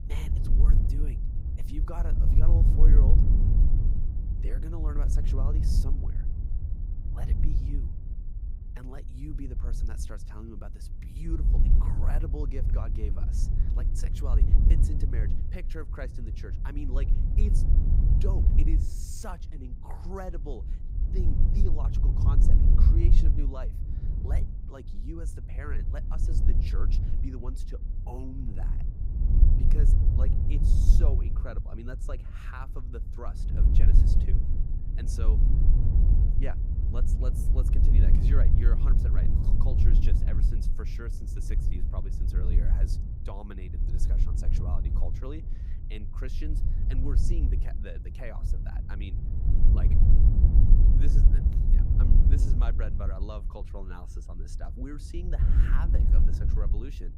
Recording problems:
wind noise on the microphone; heavy; as loud as the speech

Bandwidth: 15.5 kHz